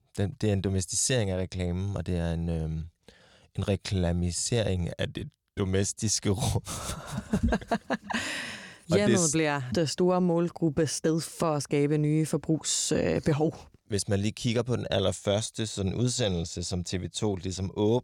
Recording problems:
none

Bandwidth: 18 kHz